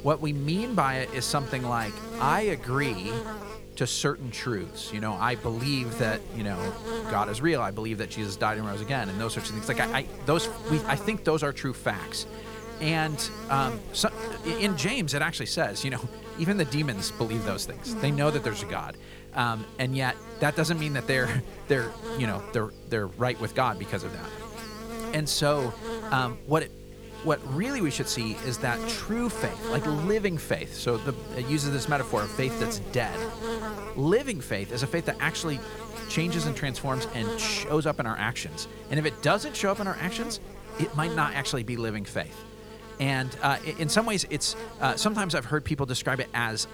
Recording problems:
electrical hum; loud; throughout; 50 Hz, 10 dB below the speech

